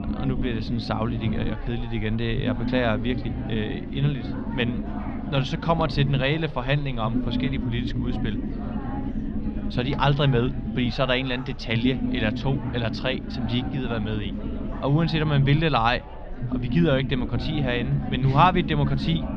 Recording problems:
muffled; slightly; fading above 3.5 kHz
chatter from many people; noticeable; throughout; 15 dB below the speech
low rumble; noticeable; throughout; 10 dB below the speech

